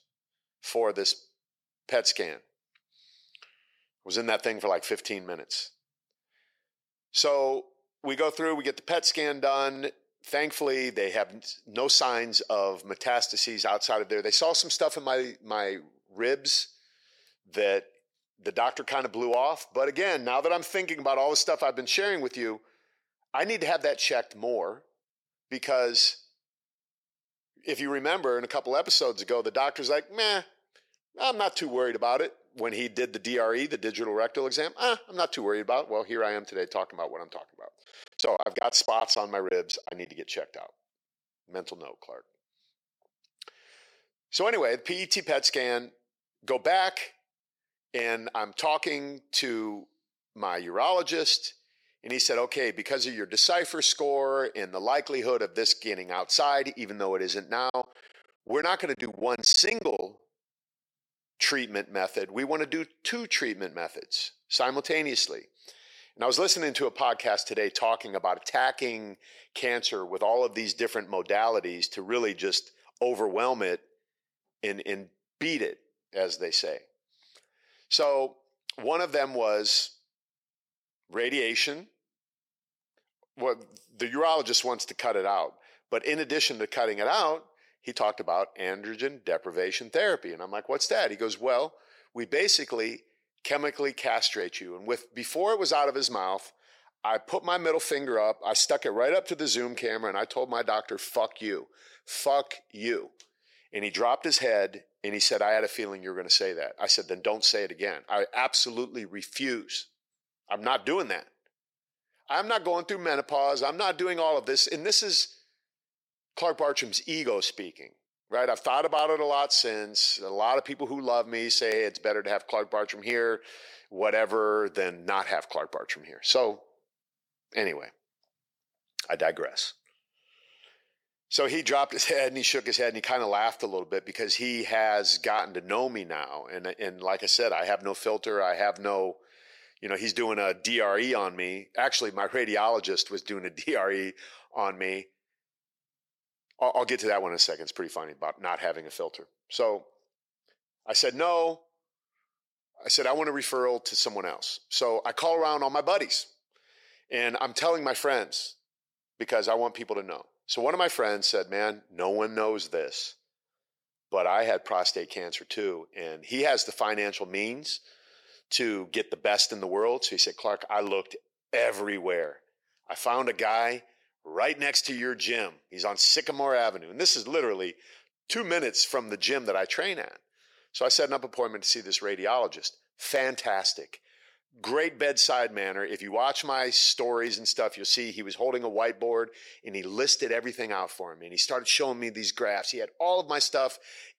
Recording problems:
thin; somewhat; fading below 450 Hz
choppy; very; from 38 to 40 s and from 58 s to 1:00; 15% of the speech affected

